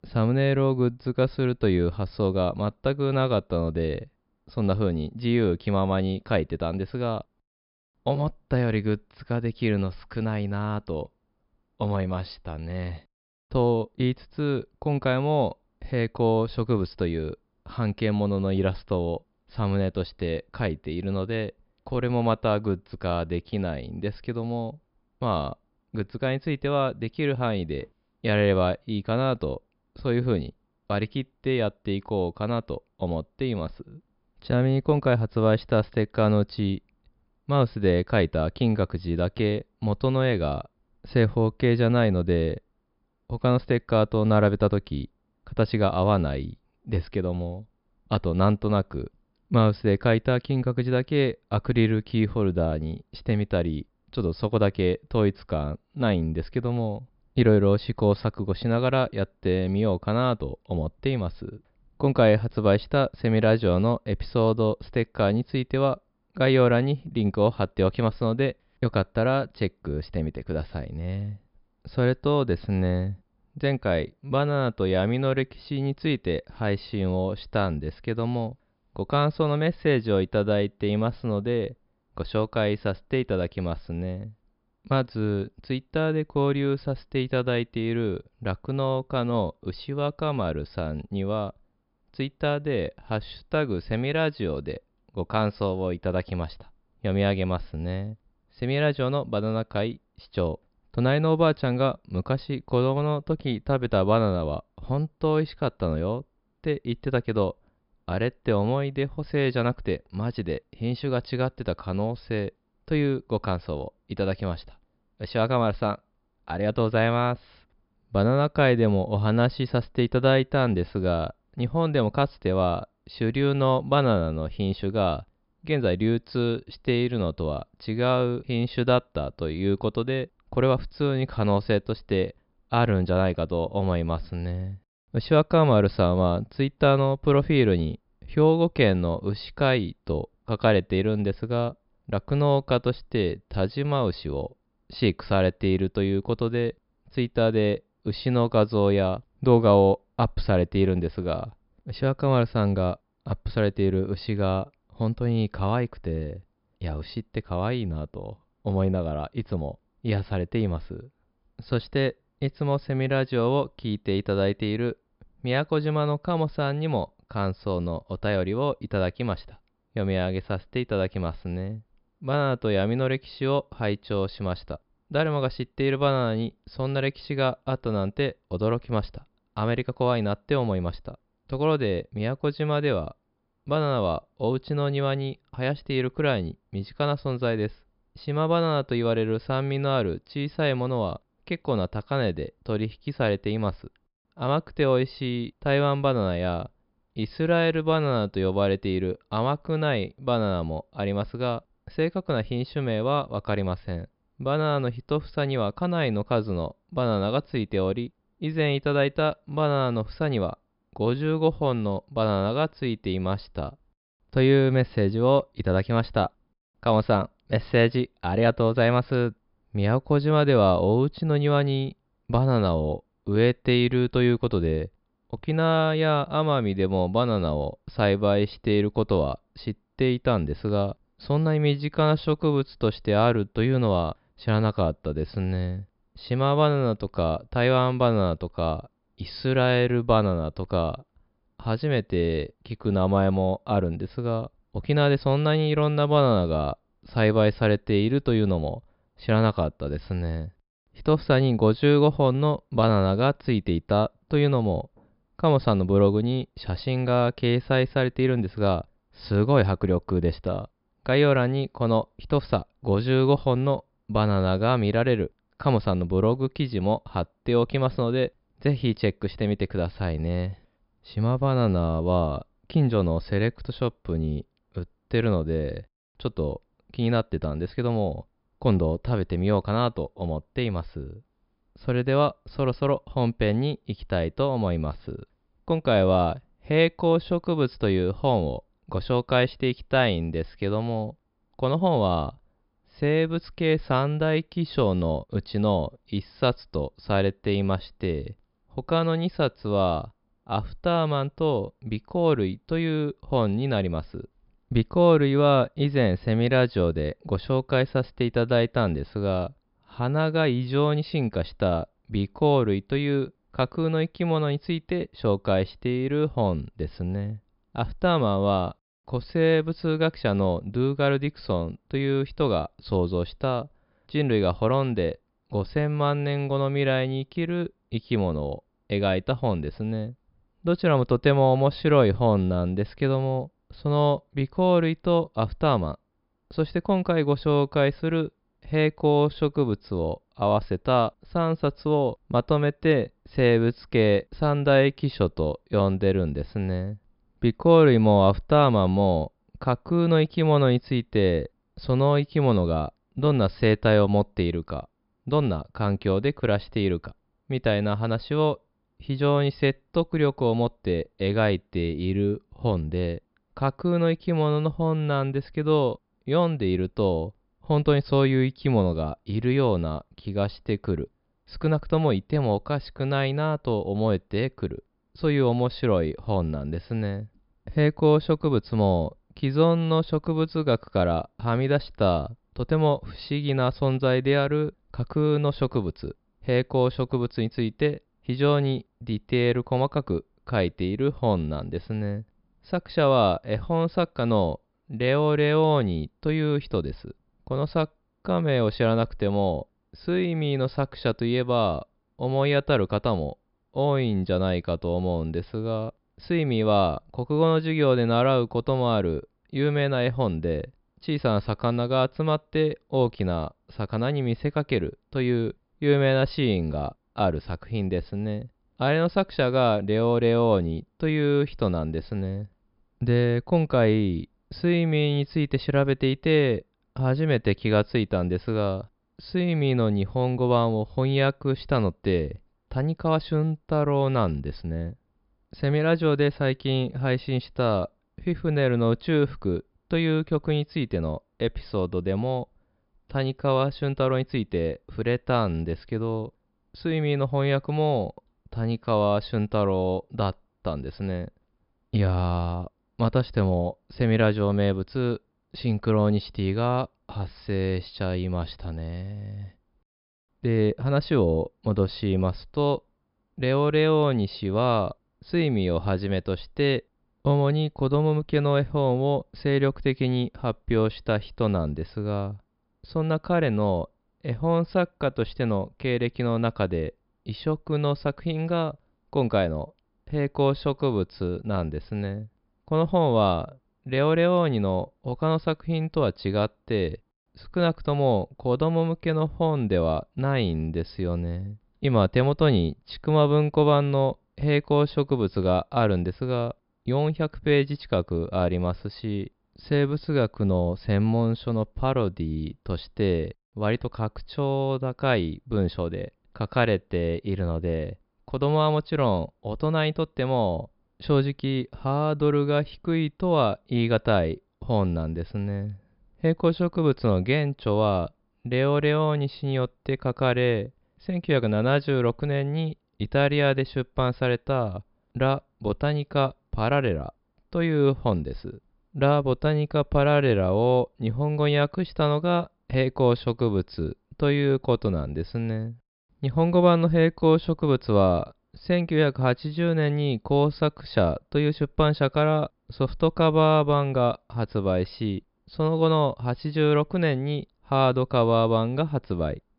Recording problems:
high frequencies cut off; noticeable; nothing above 5.5 kHz

